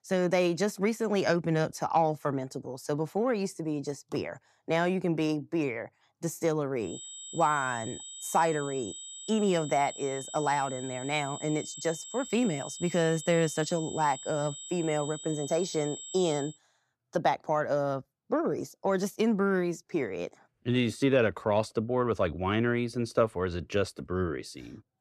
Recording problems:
high-pitched whine; noticeable; from 7 to 16 s; 8 kHz, 10 dB below the speech

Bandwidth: 14 kHz